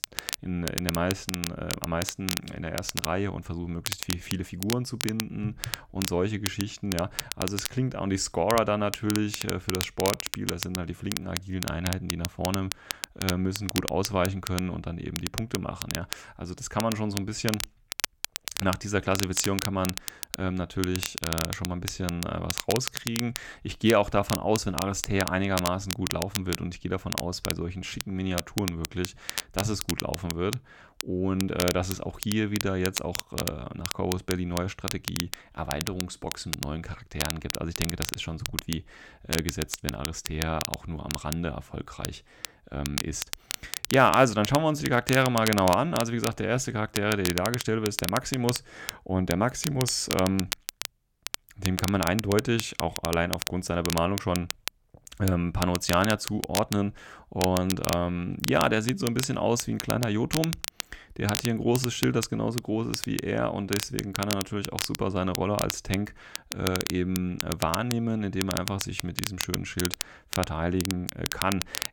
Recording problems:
crackle, like an old record; loud; 5 dB below the speech

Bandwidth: 18 kHz